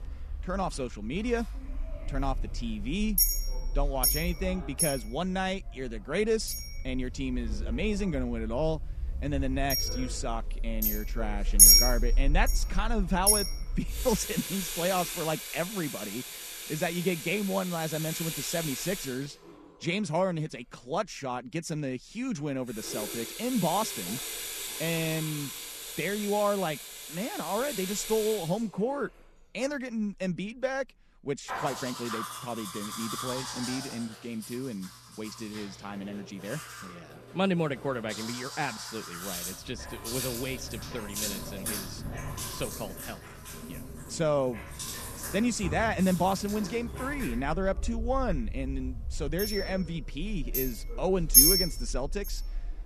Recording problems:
household noises; very loud; throughout; 3 dB above the speech

